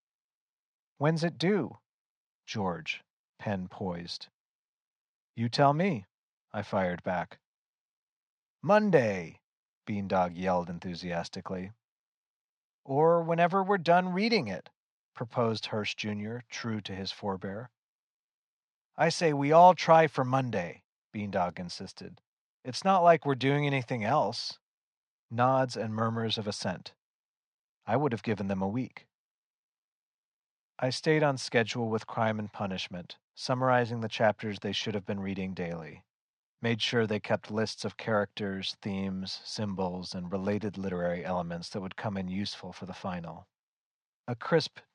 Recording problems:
muffled; very slightly; fading above 4.5 kHz

